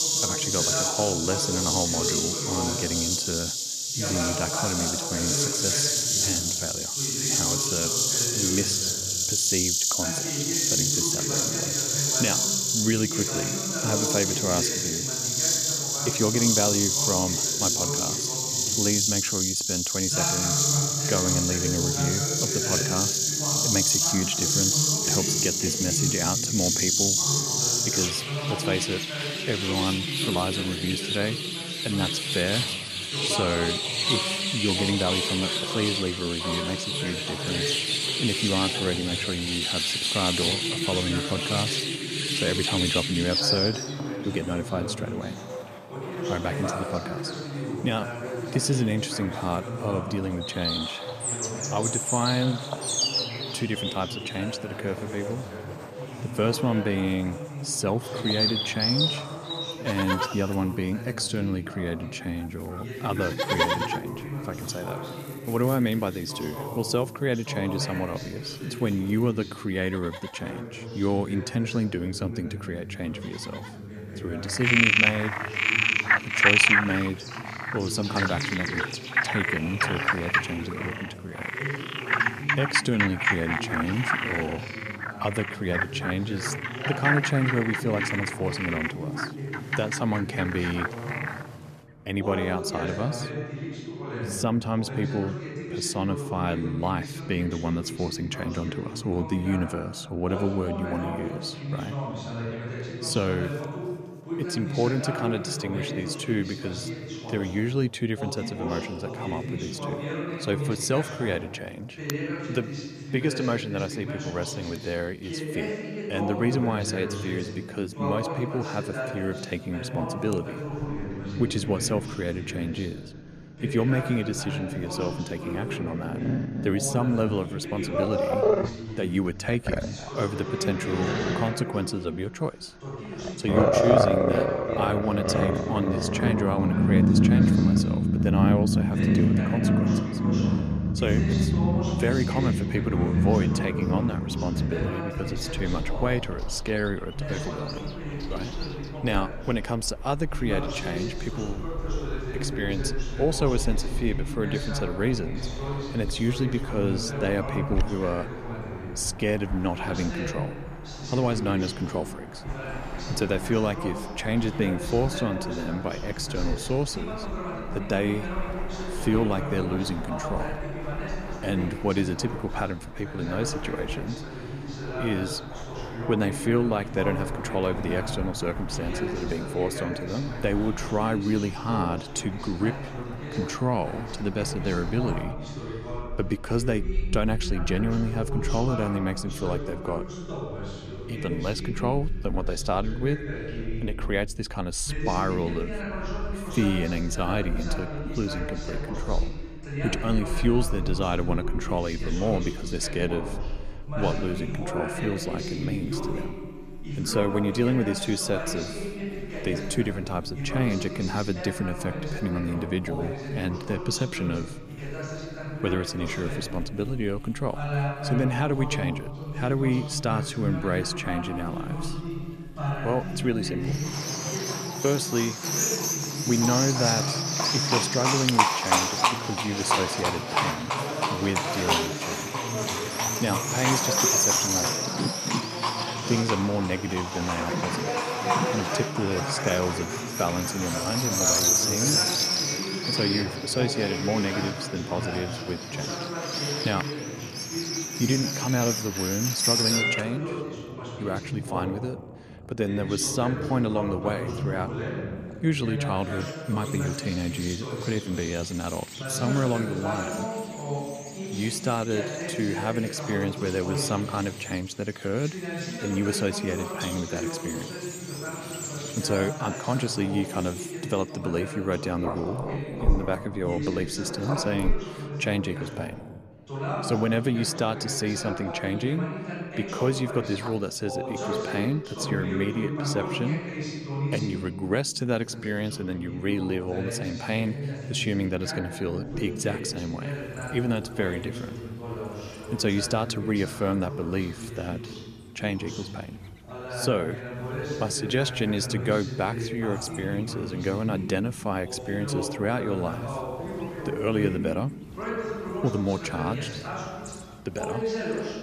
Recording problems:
animal sounds; very loud; throughout; 3 dB above the speech
voice in the background; loud; throughout; 5 dB below the speech

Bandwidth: 14.5 kHz